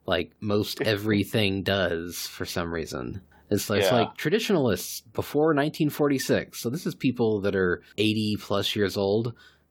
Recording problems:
none

